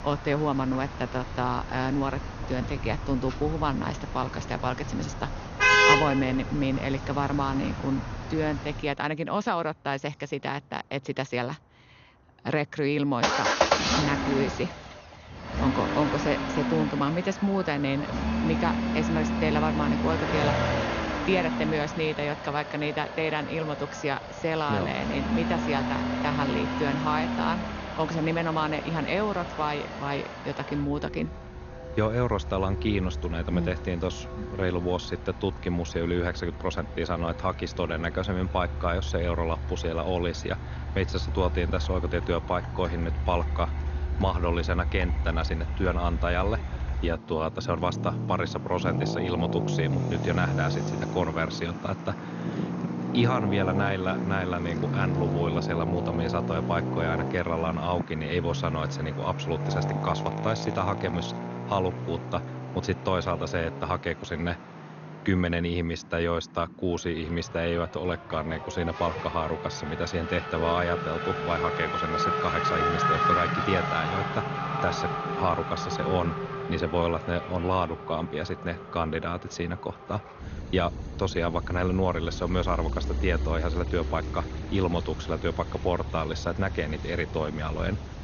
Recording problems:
garbled, watery; slightly; nothing above 6.5 kHz
traffic noise; loud; throughout; 1 dB below the speech

